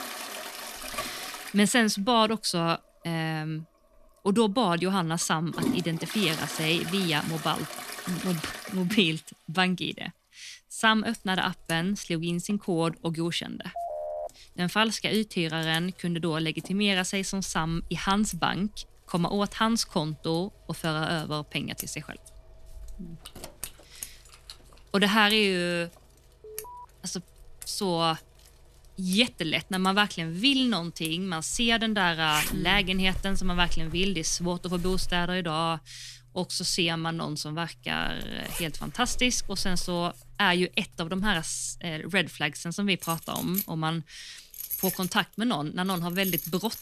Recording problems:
household noises; noticeable; throughout; 10 dB below the speech
phone ringing; noticeable; at 14 s; peak 7 dB below the speech
jangling keys; faint; from 23 to 25 s; peak 15 dB below the speech
alarm; faint; at 26 s; peak 15 dB below the speech

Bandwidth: 14 kHz